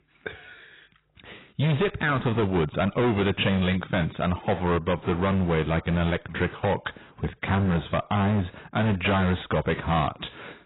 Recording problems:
distortion; heavy; 16% of the sound clipped
garbled, watery; badly; nothing above 4 kHz

